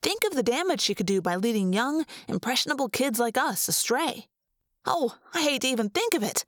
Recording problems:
squashed, flat; somewhat

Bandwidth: 18.5 kHz